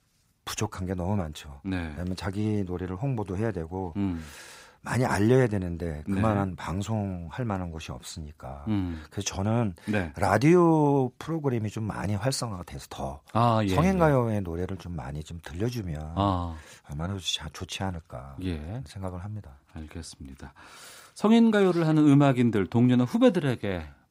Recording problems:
none

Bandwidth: 15.5 kHz